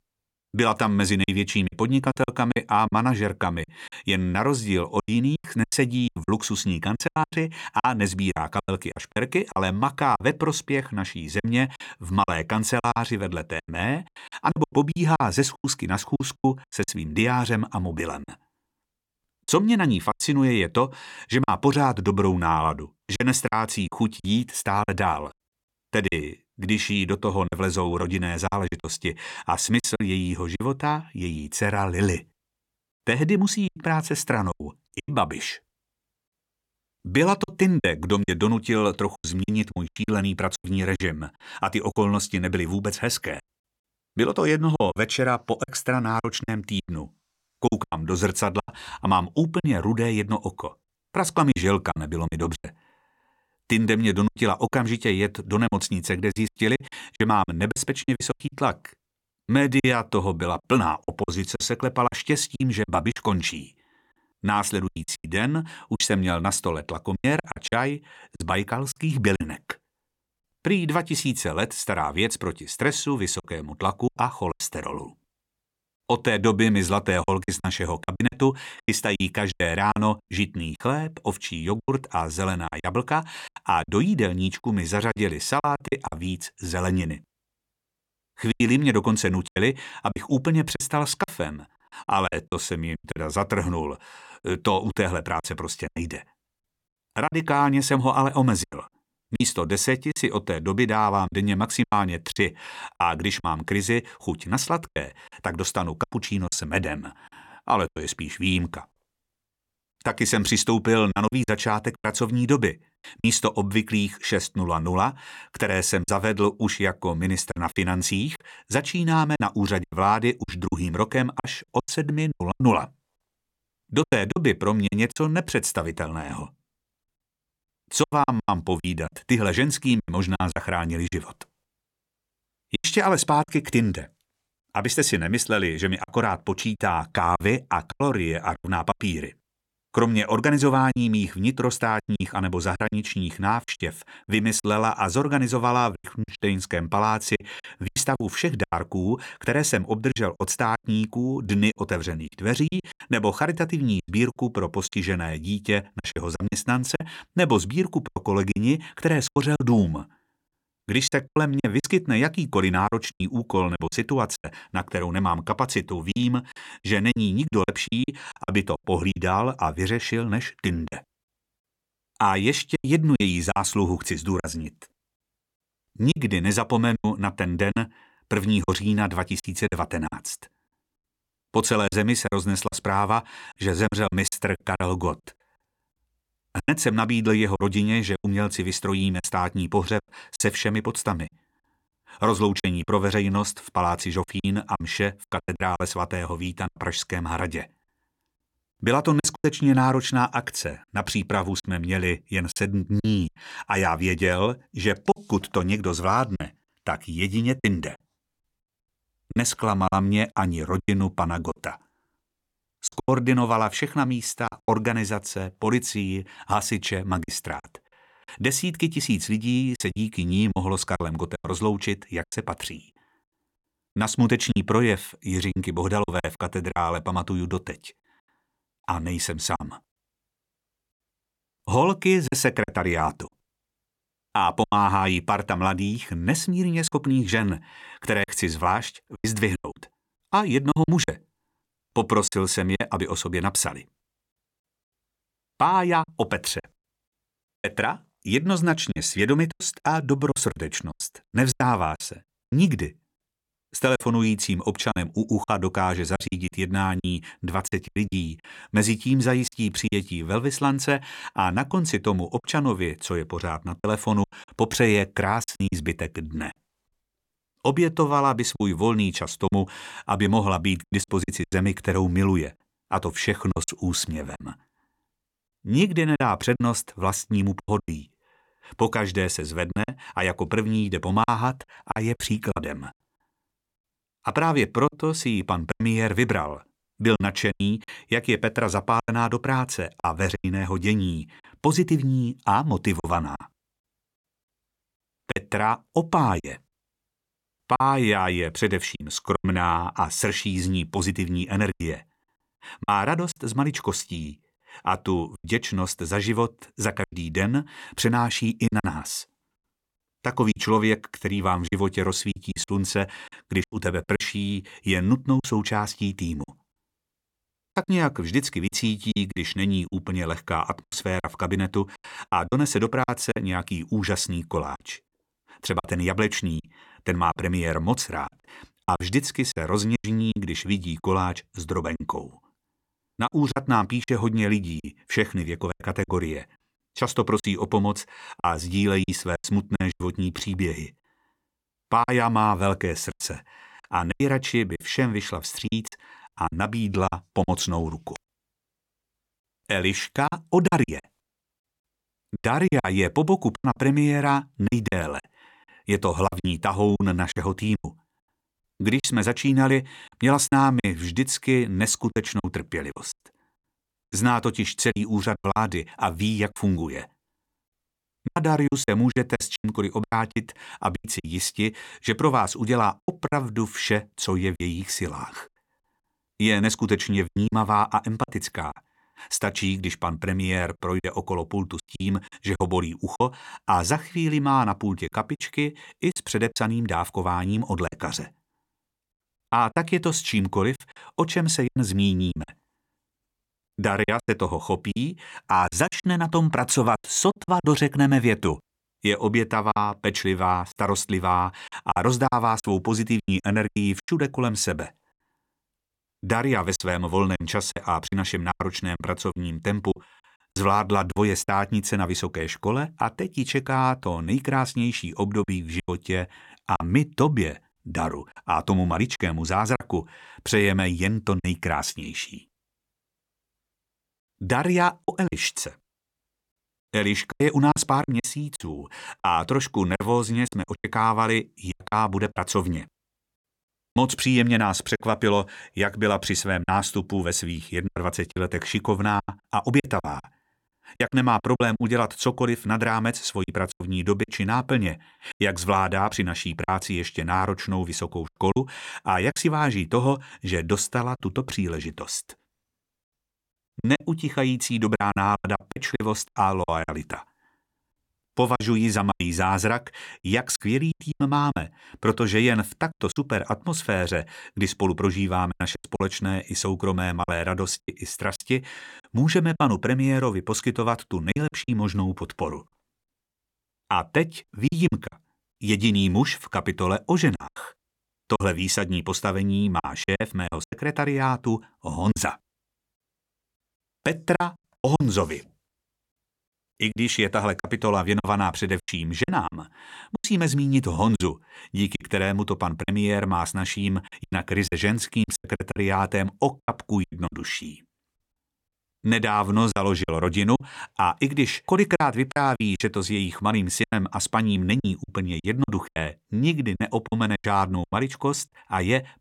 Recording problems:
choppy; very; 8% of the speech affected

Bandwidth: 17 kHz